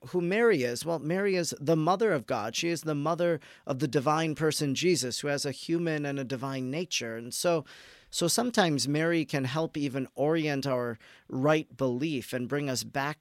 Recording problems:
none

